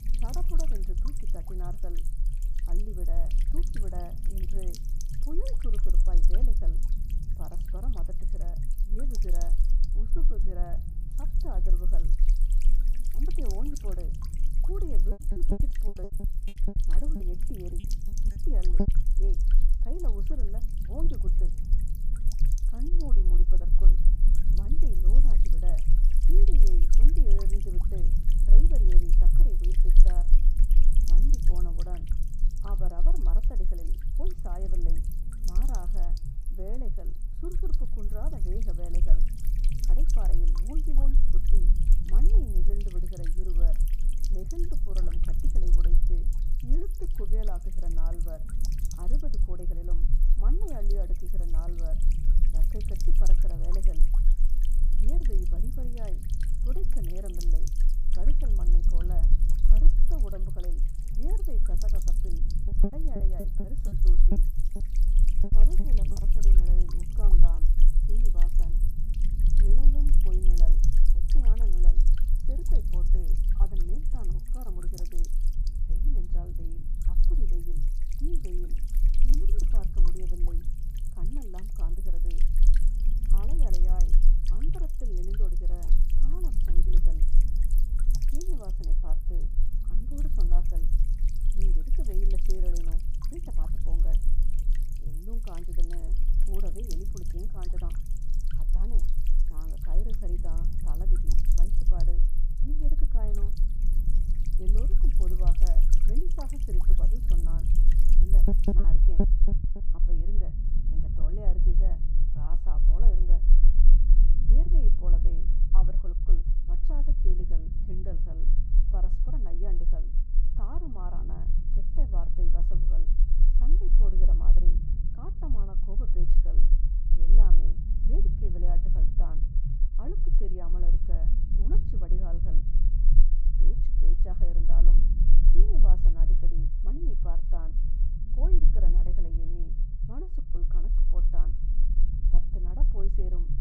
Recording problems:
muffled; very; fading above 1.5 kHz
electrical hum; loud; until 1:49; 60 Hz, 7 dB below the speech
low rumble; loud; throughout; 4 dB below the speech
choppy; very; from 15 to 19 s, from 1:03 to 1:06 and at 1:49; 18% of the speech affected

